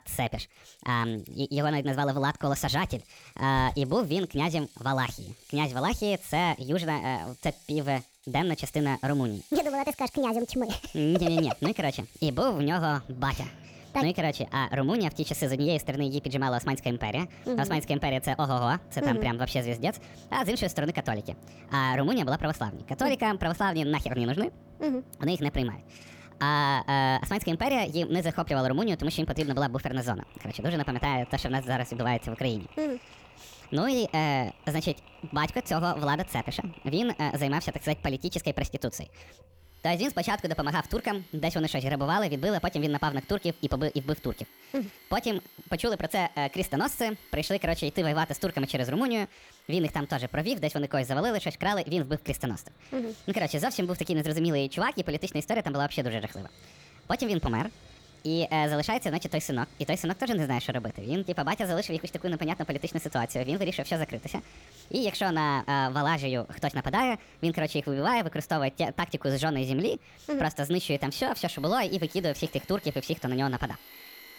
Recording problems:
wrong speed and pitch; too fast and too high; 1.5 times normal speed
machinery noise; faint; throughout; 25 dB below the speech

